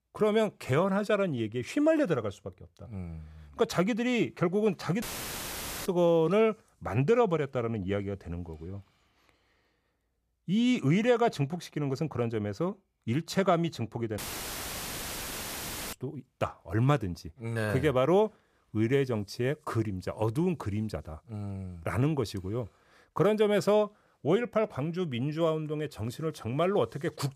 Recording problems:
audio cutting out; filled with static; at 5 s for 1 s and at 14 s for 2 s

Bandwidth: 14.5 kHz